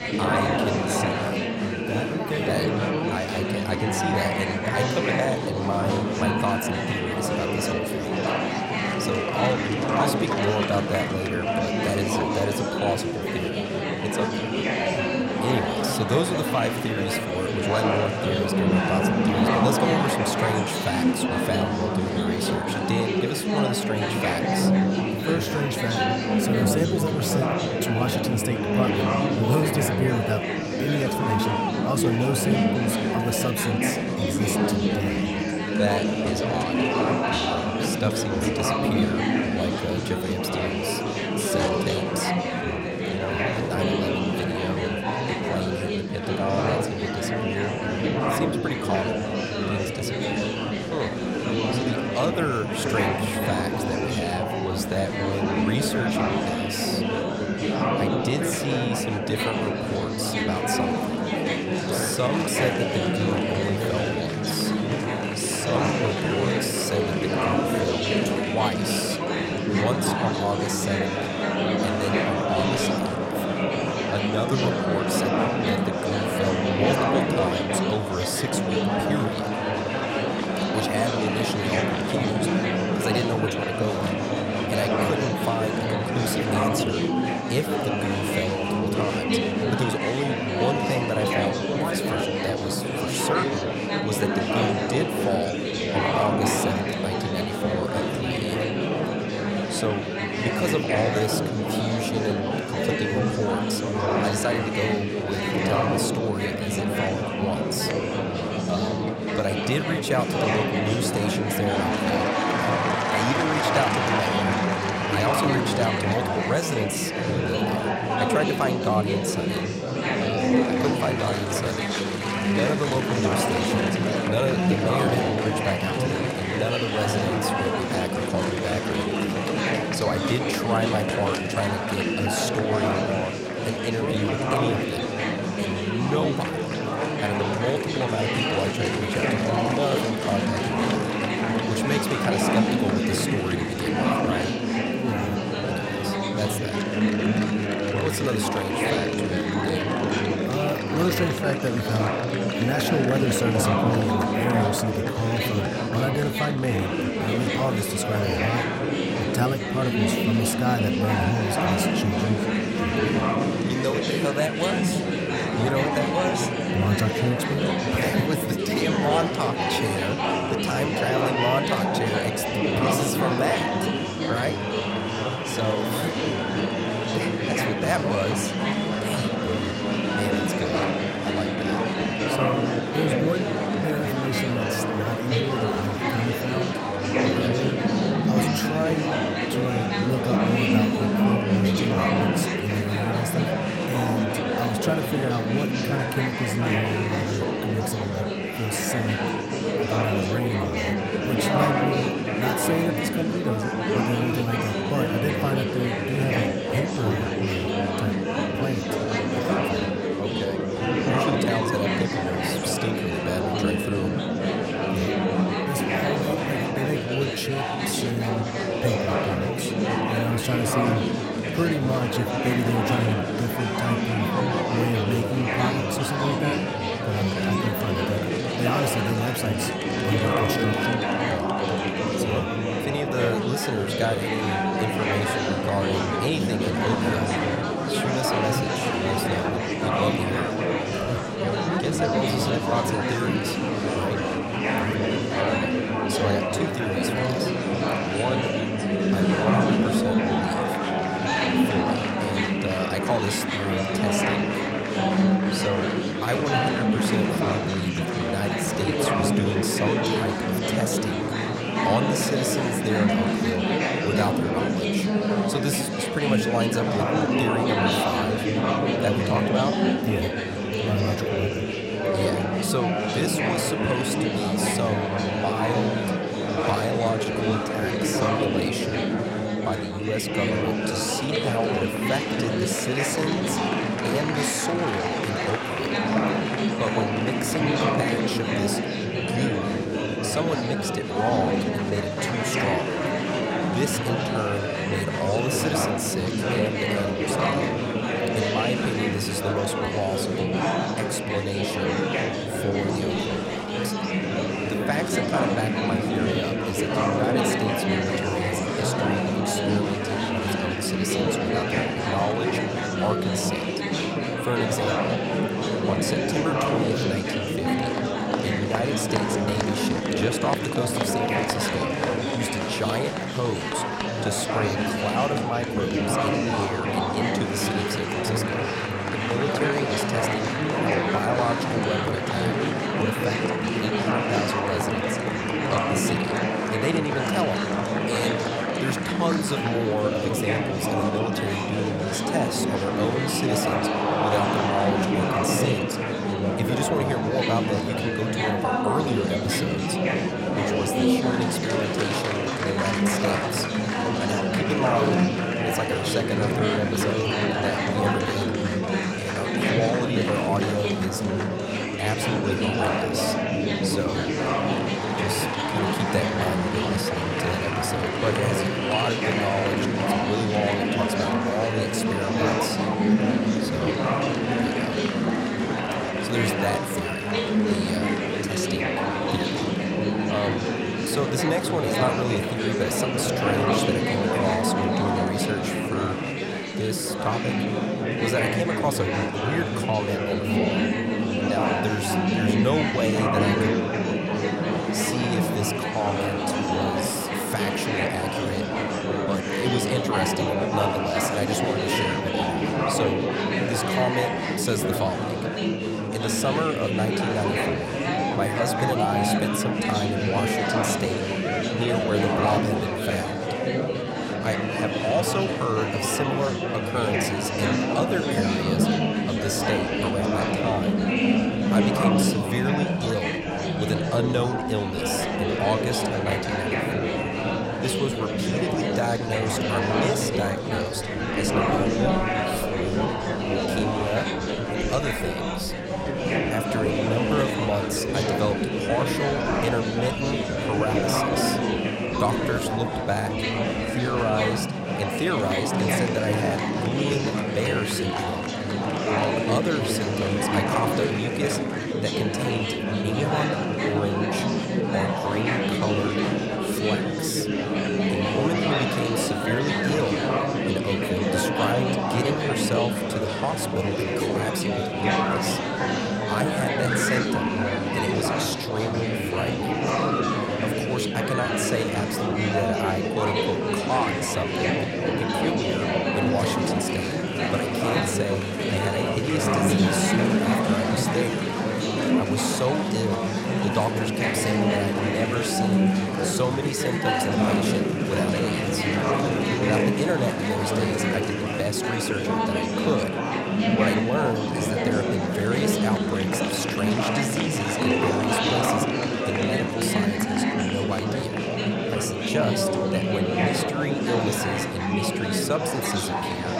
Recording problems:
murmuring crowd; very loud; throughout; 4 dB above the speech

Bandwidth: 16 kHz